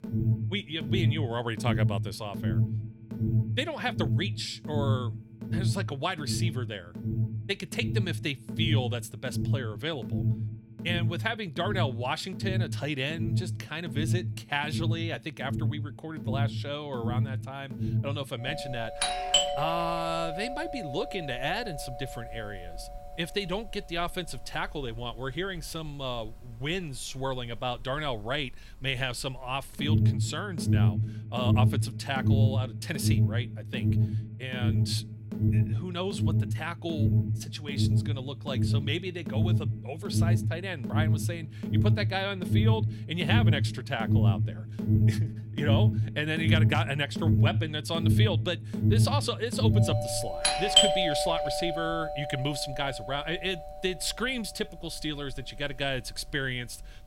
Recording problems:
alarms or sirens; very loud; throughout; 4 dB above the speech

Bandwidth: 16 kHz